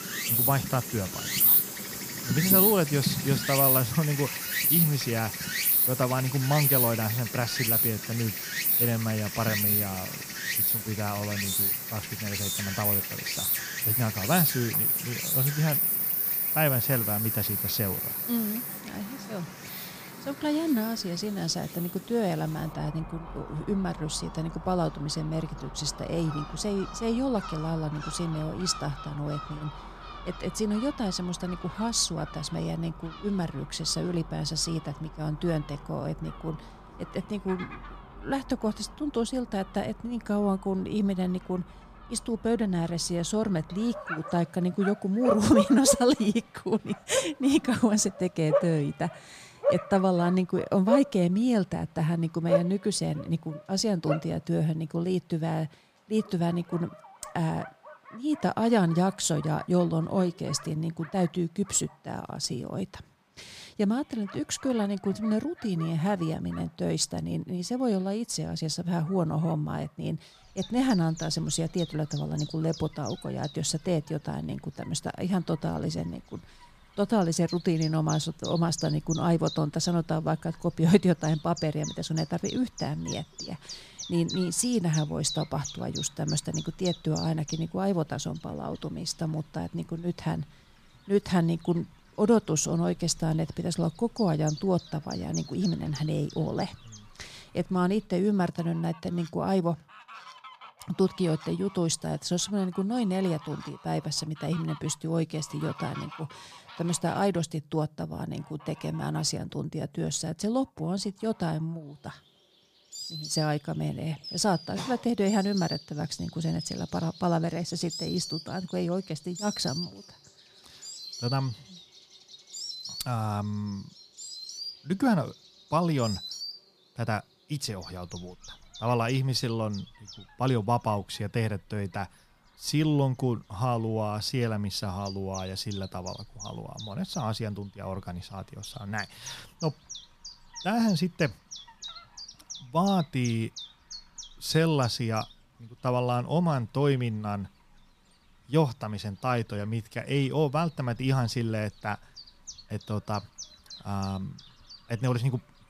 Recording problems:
animal sounds; loud; throughout; 1 dB below the speech

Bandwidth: 15 kHz